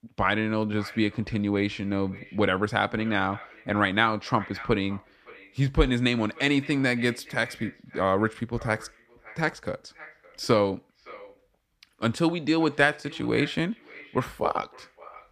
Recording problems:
echo of what is said; faint; throughout; 560 ms later, 20 dB below the speech

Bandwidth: 14.5 kHz